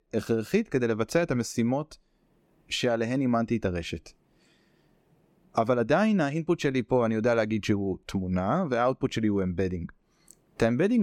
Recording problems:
abrupt cut into speech; at the end

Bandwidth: 17 kHz